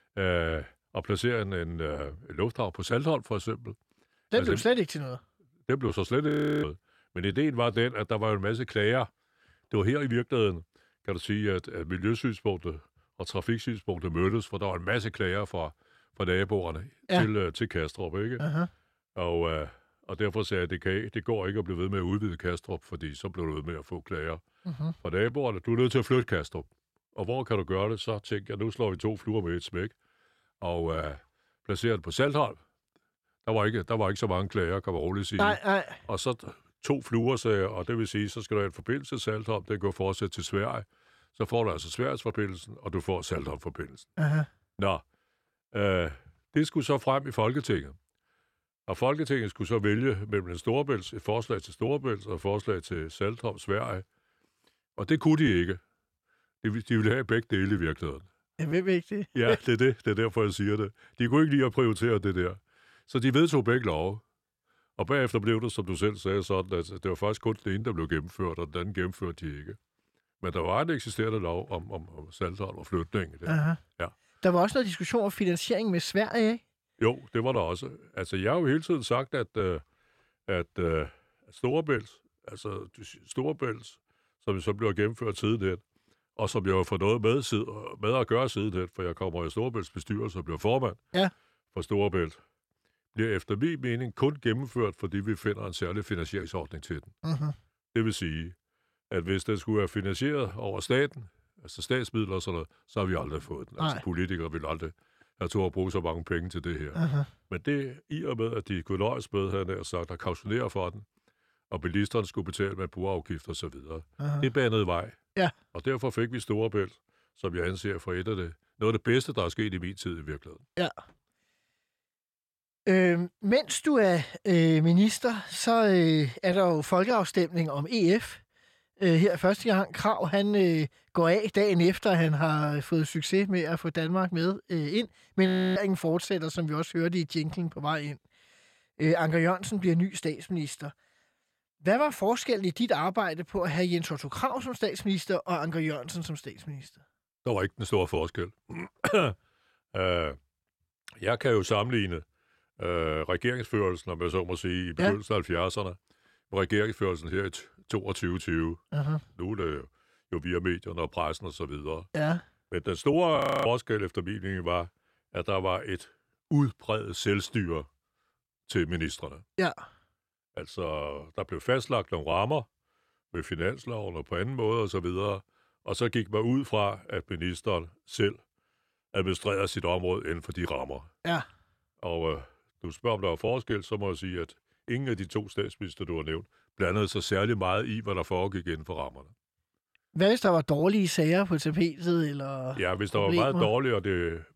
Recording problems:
audio freezing; at 6.5 s, at 2:15 and at 2:43

